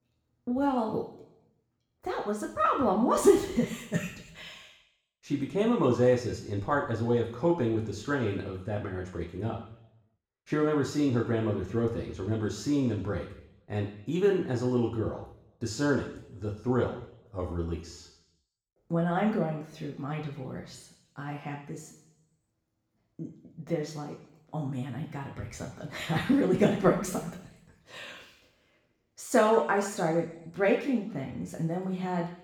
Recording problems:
off-mic speech; far
room echo; noticeable; dies away in 0.8 s

